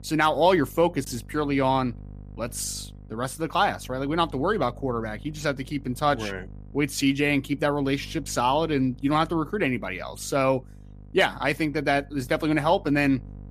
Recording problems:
electrical hum; faint; throughout; 50 Hz, 30 dB below the speech

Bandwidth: 14.5 kHz